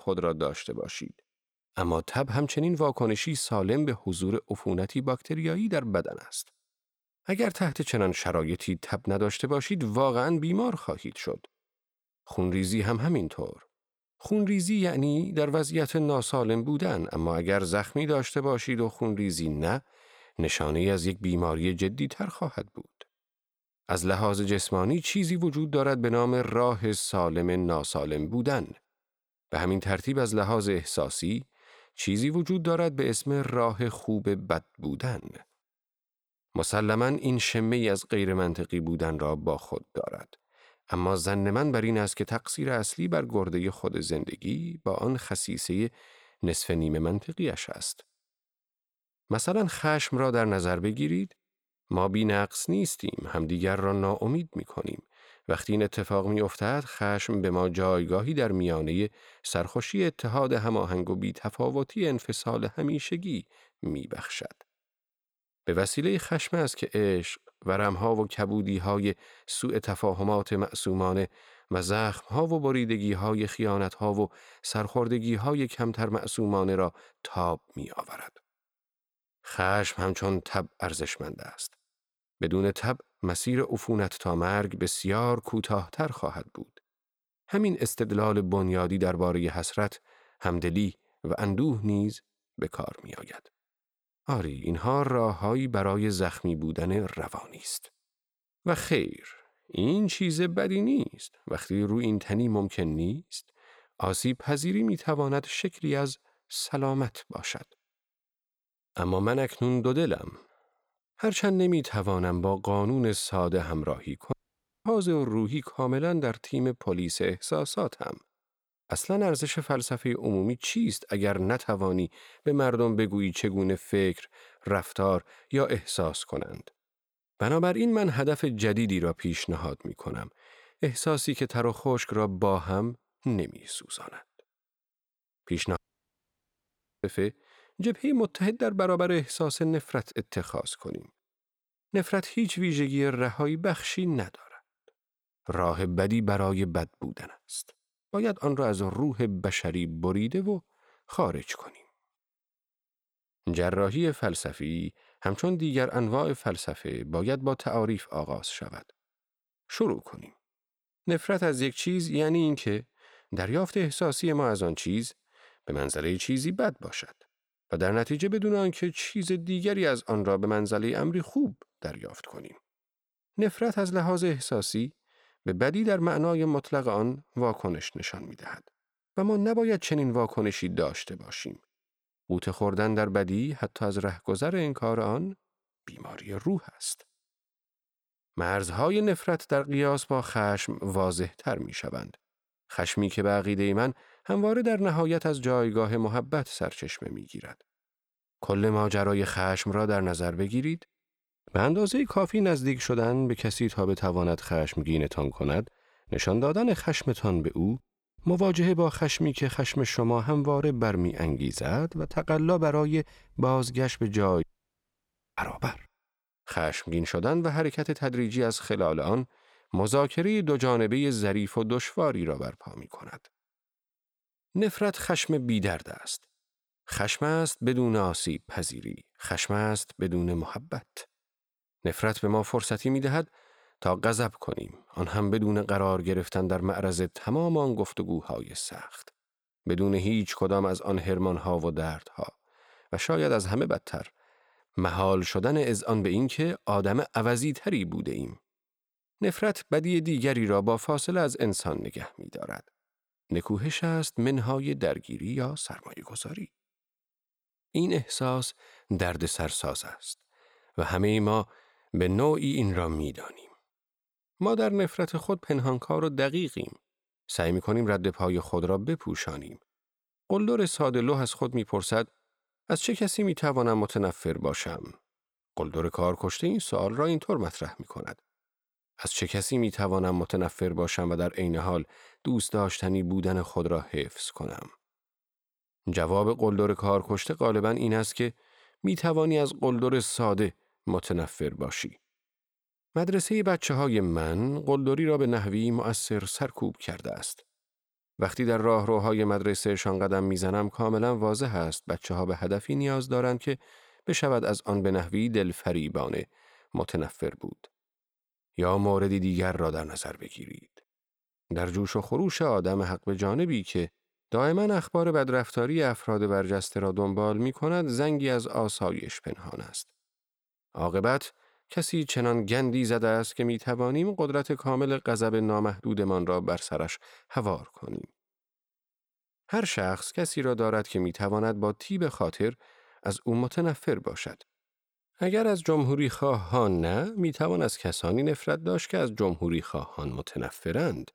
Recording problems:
audio cutting out; at 1:54 for 0.5 s, at 2:16 for 1.5 s and at 3:34 for 1 s

